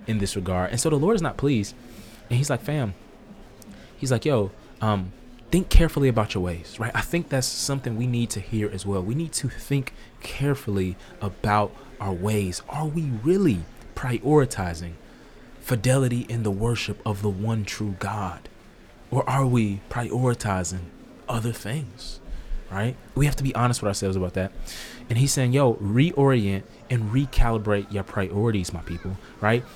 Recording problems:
murmuring crowd; faint; throughout; 25 dB below the speech

